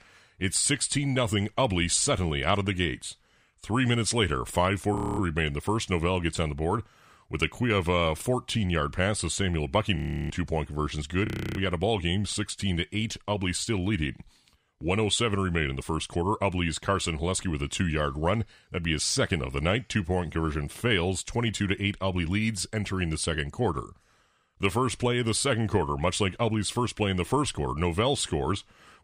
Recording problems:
audio freezing; at 5 s, at 10 s and at 11 s

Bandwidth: 15.5 kHz